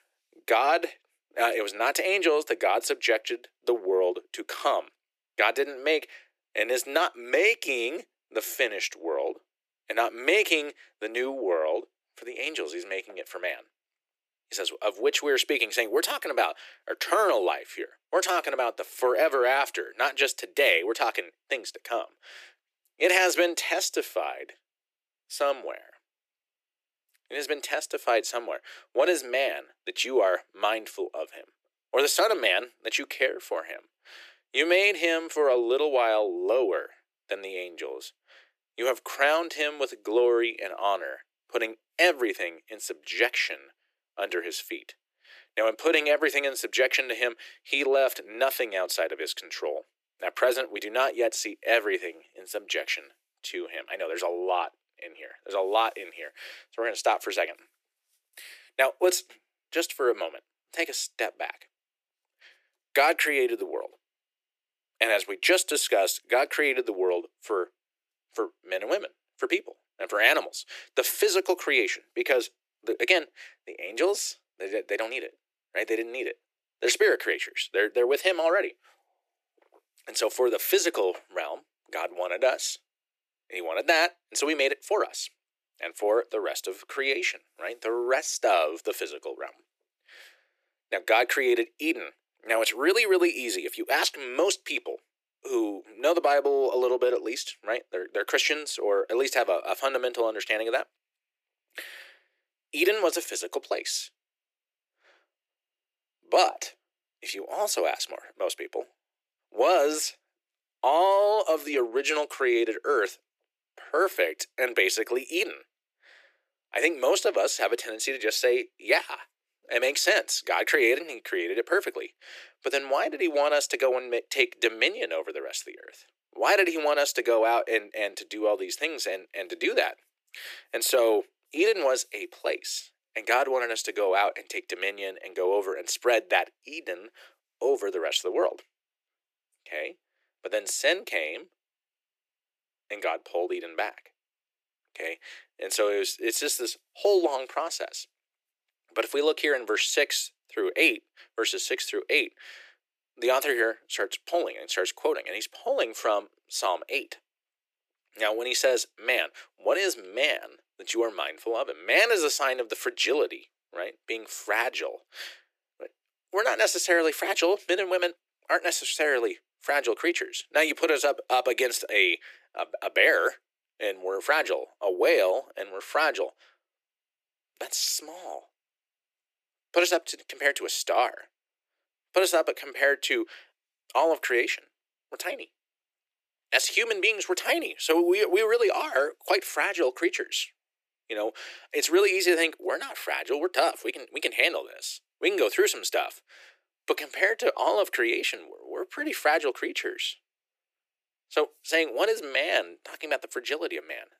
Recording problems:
thin; very; fading below 350 Hz

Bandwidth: 14.5 kHz